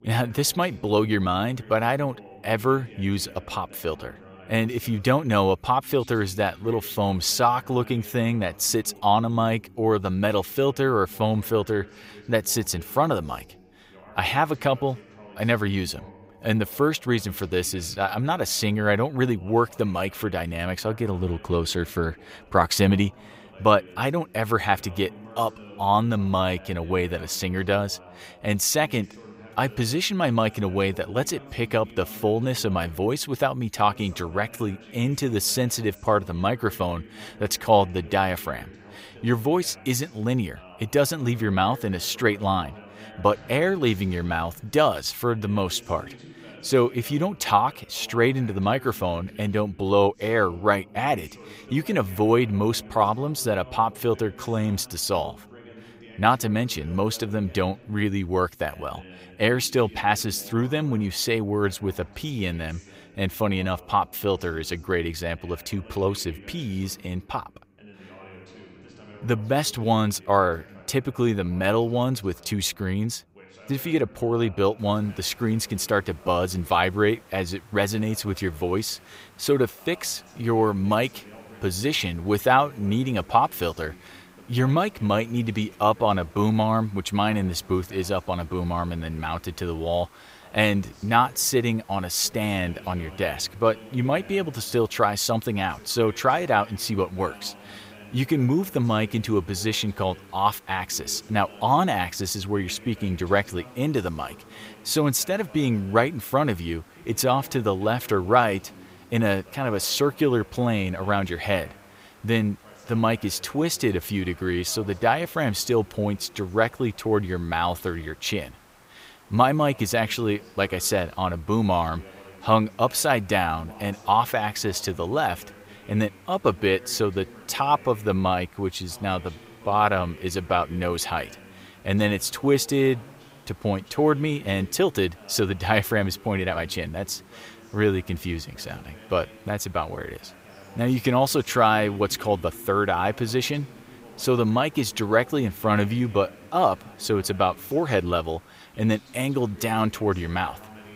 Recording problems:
voice in the background; faint; throughout; 25 dB below the speech
hiss; faint; from 1:15 on; 30 dB below the speech

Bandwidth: 15.5 kHz